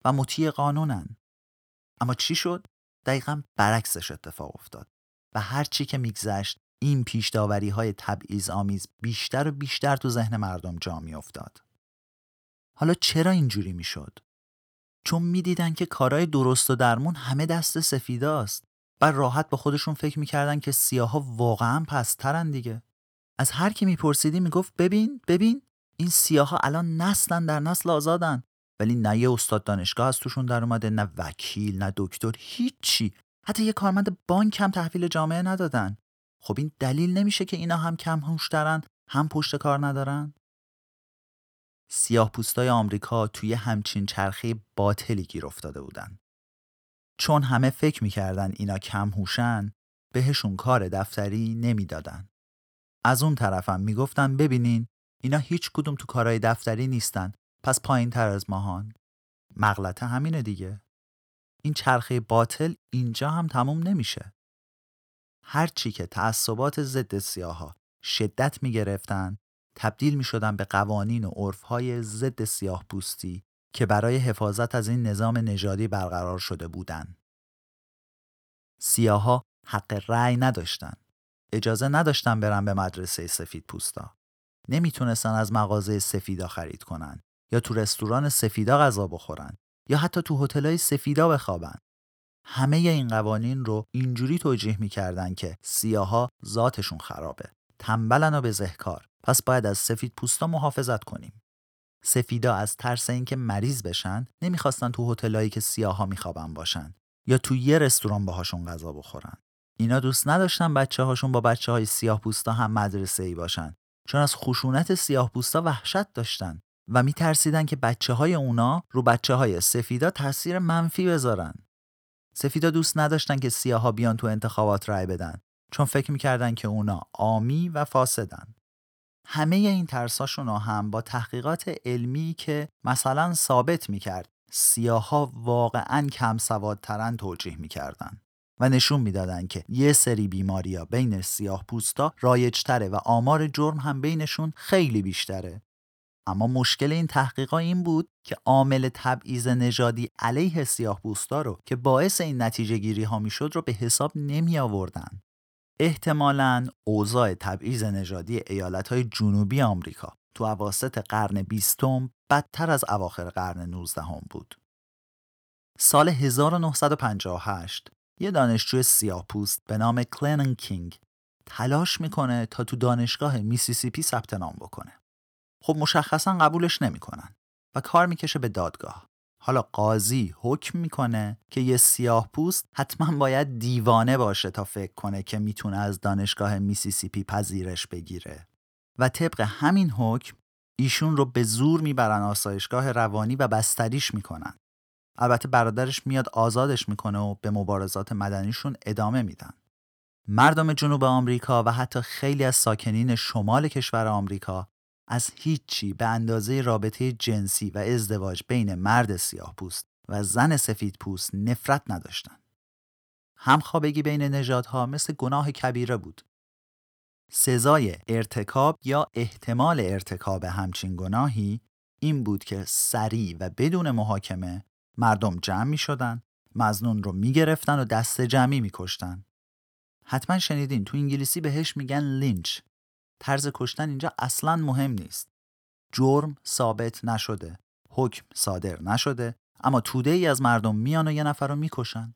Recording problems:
none

